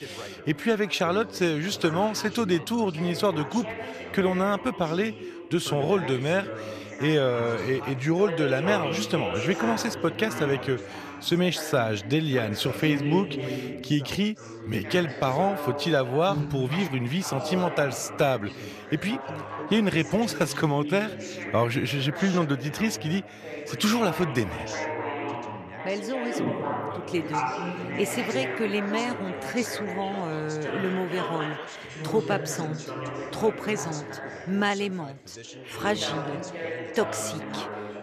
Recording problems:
background chatter; loud; throughout; 3 voices, 7 dB below the speech

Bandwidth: 14 kHz